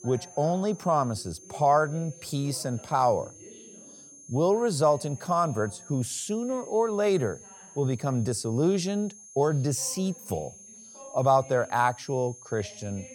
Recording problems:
high-pitched whine; noticeable; throughout; 6.5 kHz, 20 dB below the speech
voice in the background; faint; throughout; 25 dB below the speech

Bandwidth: 17.5 kHz